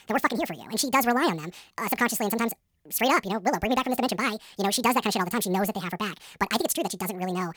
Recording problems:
wrong speed and pitch; too fast and too high; 1.7 times normal speed

